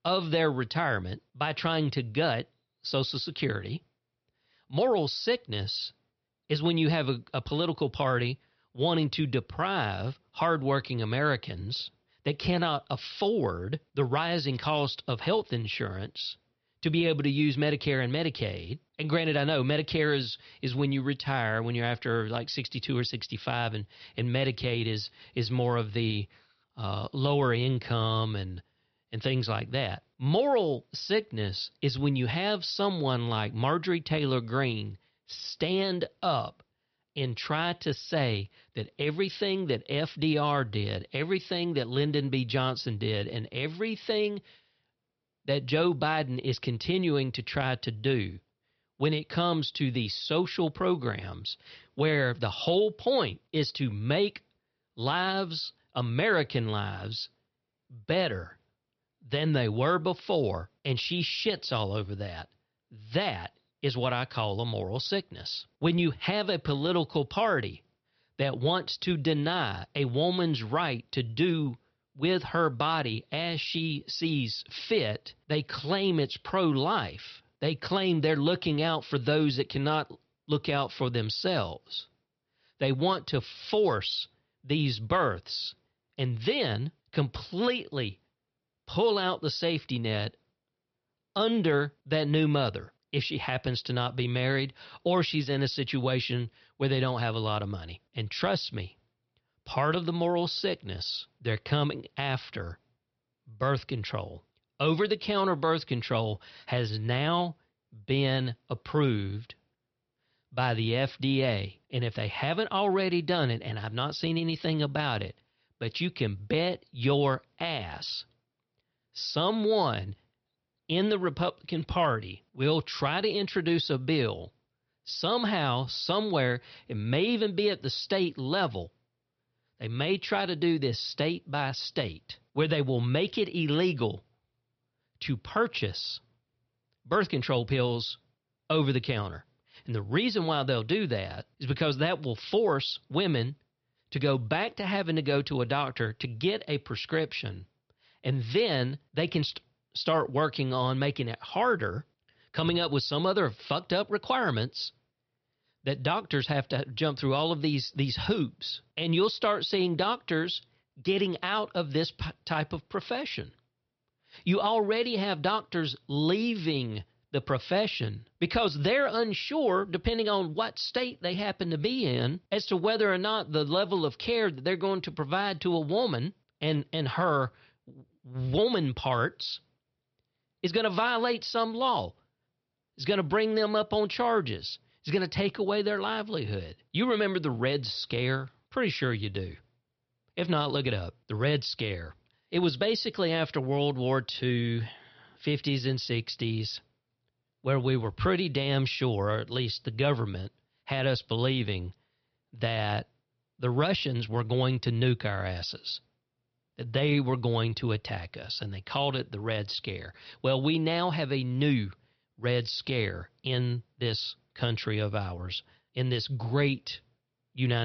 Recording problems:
high frequencies cut off; noticeable; nothing above 5.5 kHz
abrupt cut into speech; at the end

